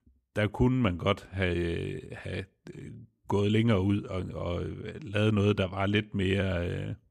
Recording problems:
none

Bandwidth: 14.5 kHz